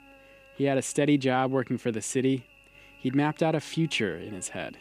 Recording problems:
electrical hum; faint; throughout; 50 Hz, 25 dB below the speech

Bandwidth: 14.5 kHz